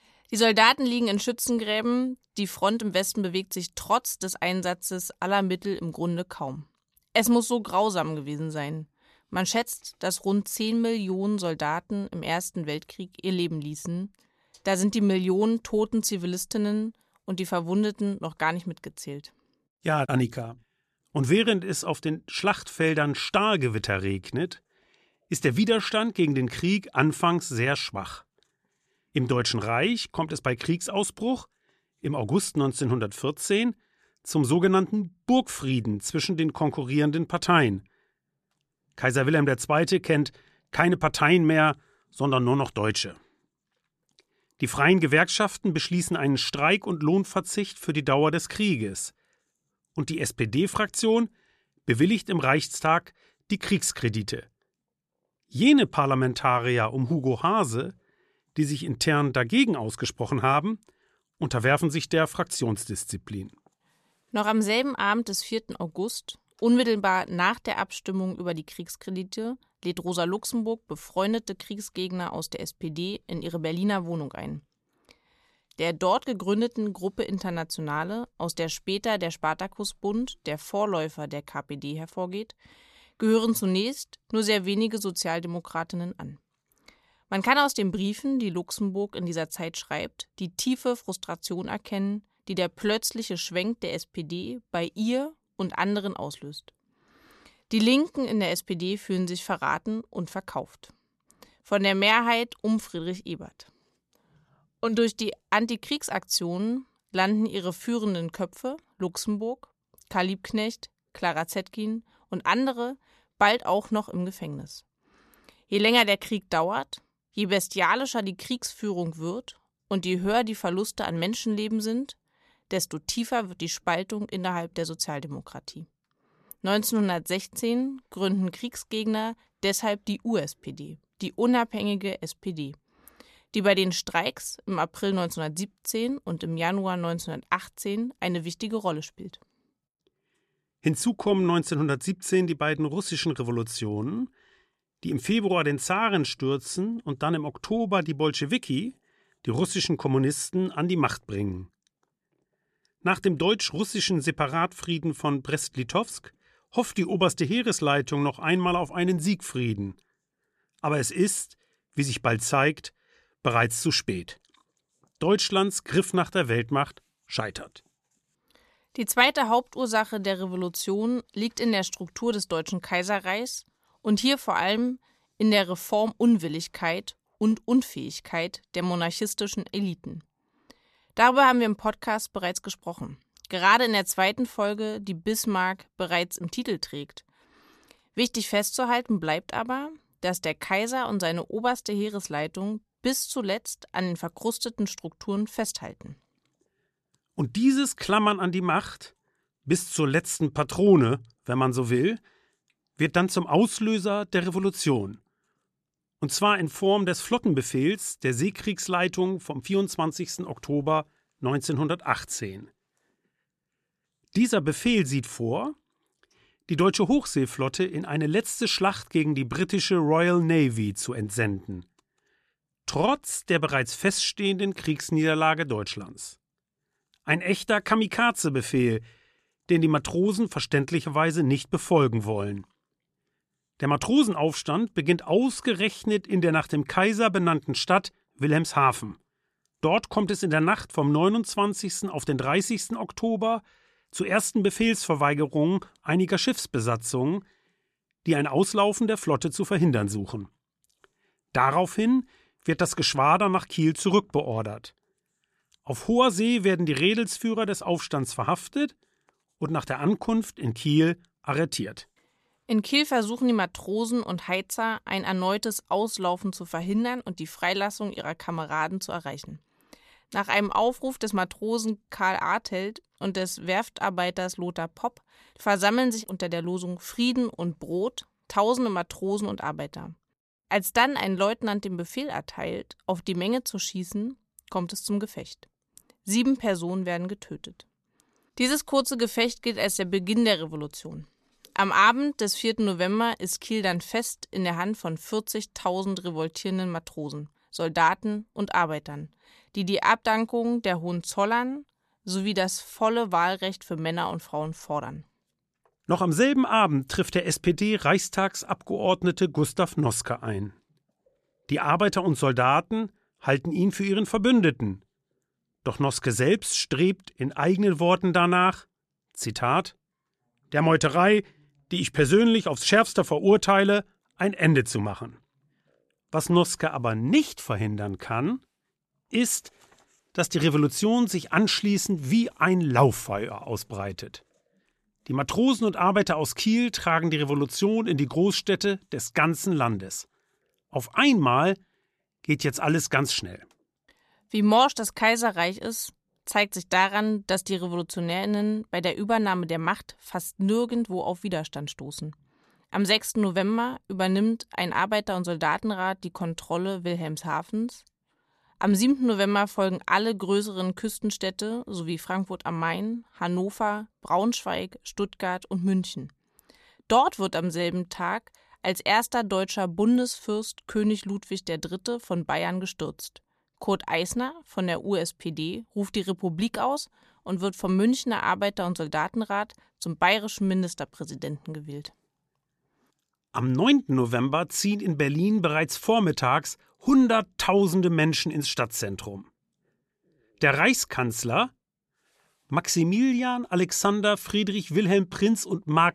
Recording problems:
none

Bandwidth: 13.5 kHz